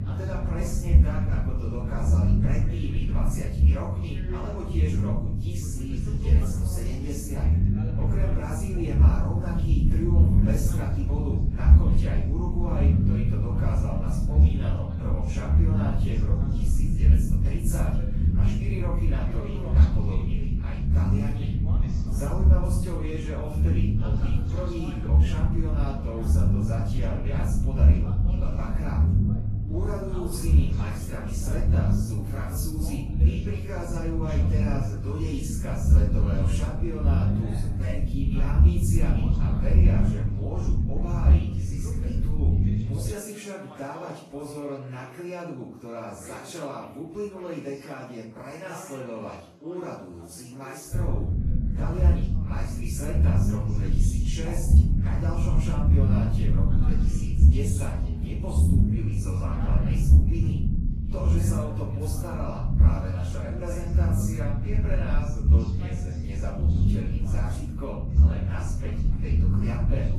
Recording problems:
off-mic speech; far
room echo; noticeable; dies away in 0.5 s
garbled, watery; slightly; nothing above 12.5 kHz
low rumble; loud; until 43 s and from 51 s on; as loud as the speech
voice in the background; noticeable; throughout; 15 dB below the speech

